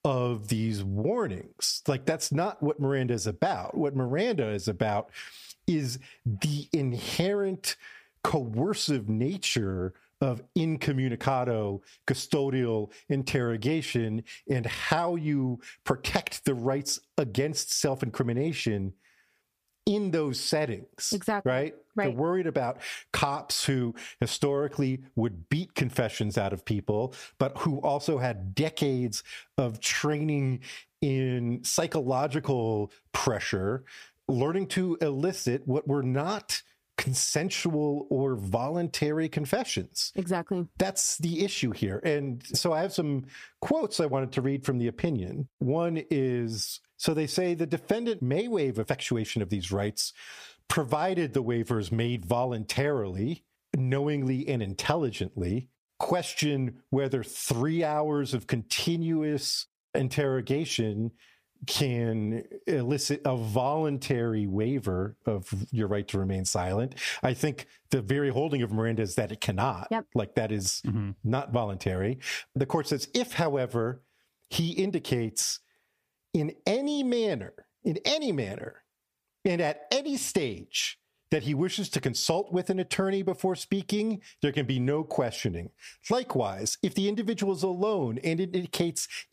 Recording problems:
squashed, flat; somewhat

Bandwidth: 15 kHz